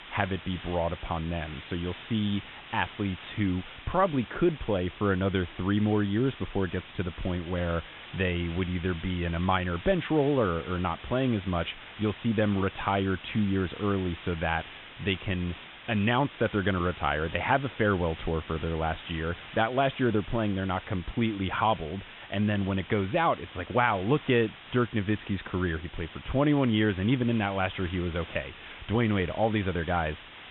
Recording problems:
high frequencies cut off; severe; nothing above 3.5 kHz
hiss; noticeable; throughout; 15 dB below the speech

